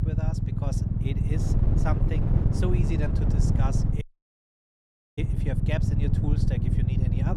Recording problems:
wind noise on the microphone; heavy; 3 dB below the speech
low rumble; loud; throughout; as loud as the speech
audio cutting out; at 4 s for 1 s
abrupt cut into speech; at the end

